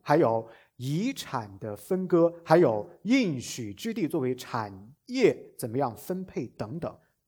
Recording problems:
none

